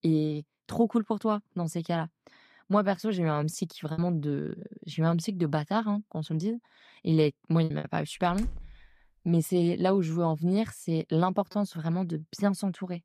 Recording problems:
choppy; occasionally; 2% of the speech affected
door banging; faint; at 8.5 s; peak 10 dB below the speech

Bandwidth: 14 kHz